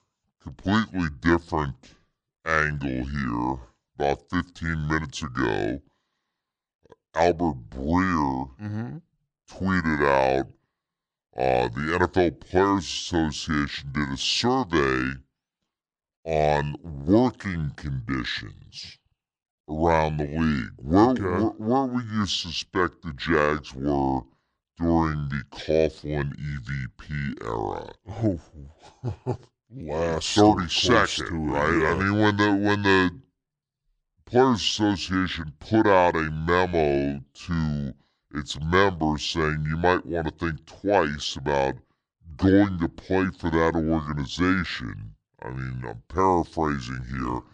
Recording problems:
wrong speed and pitch; too slow and too low; 0.7 times normal speed

